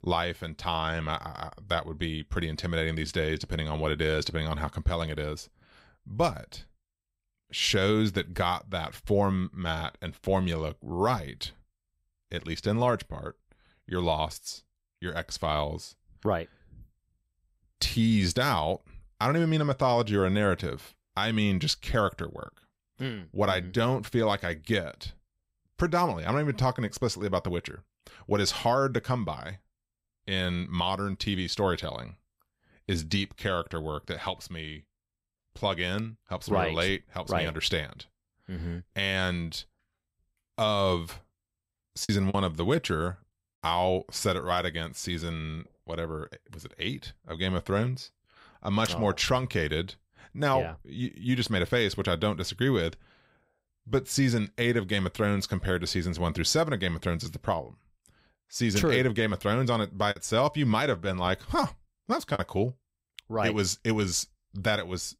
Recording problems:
choppy; very; at 42 s and from 1:00 to 1:02; 5% of the speech affected

